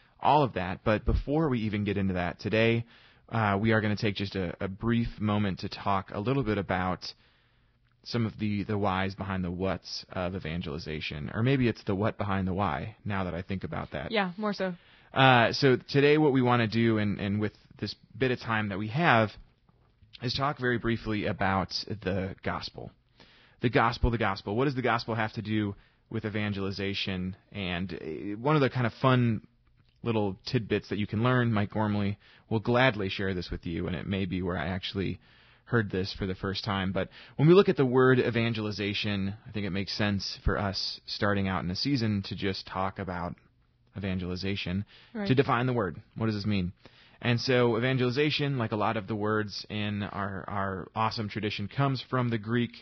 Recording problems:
garbled, watery; badly; nothing above 5.5 kHz

